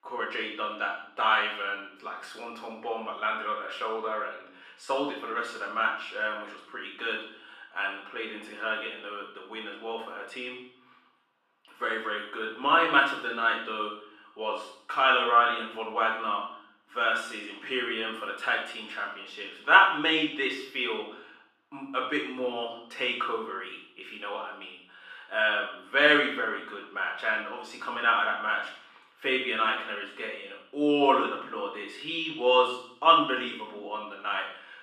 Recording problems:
off-mic speech; far
muffled; very; fading above 3.5 kHz
room echo; noticeable; dies away in 0.7 s
thin; somewhat; fading below 300 Hz

